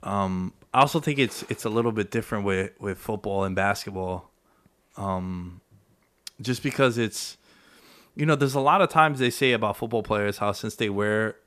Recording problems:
none

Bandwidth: 14.5 kHz